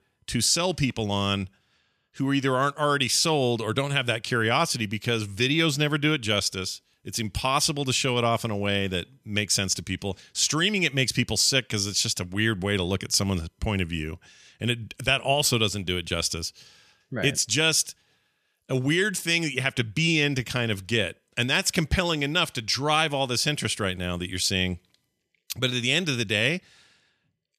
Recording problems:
none

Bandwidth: 14.5 kHz